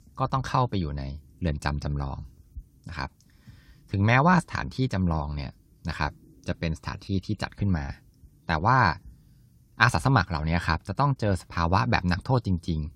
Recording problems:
none

